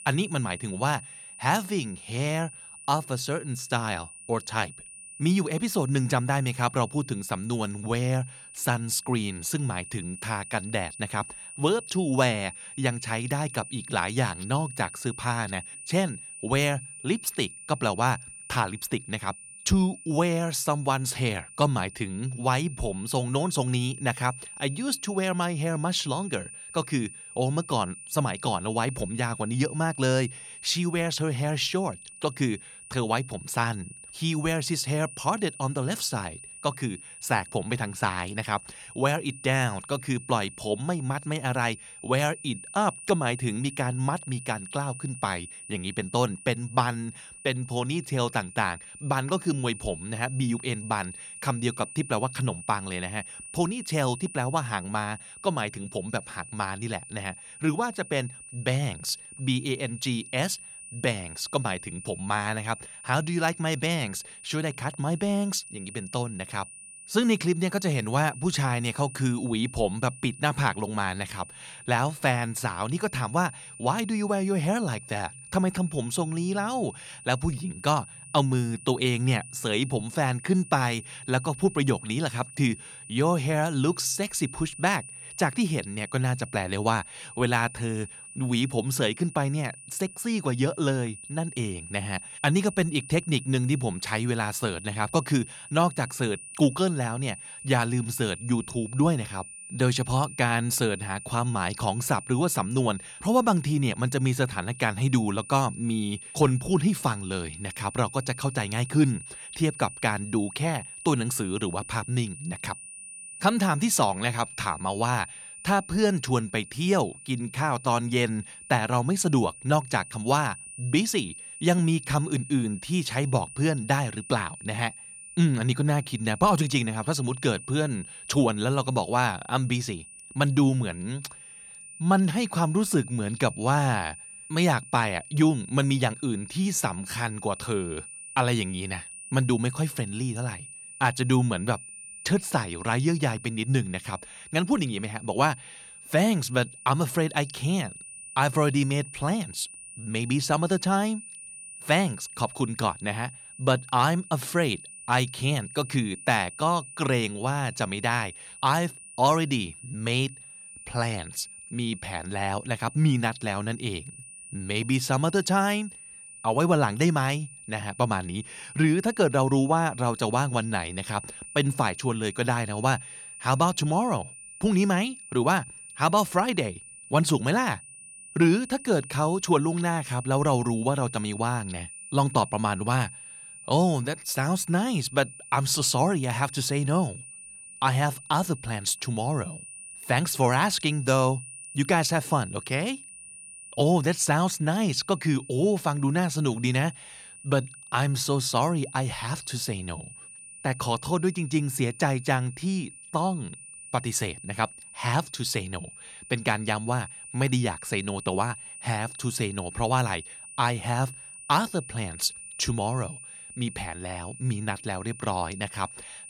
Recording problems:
high-pitched whine; noticeable; throughout; 9.5 kHz, 15 dB below the speech

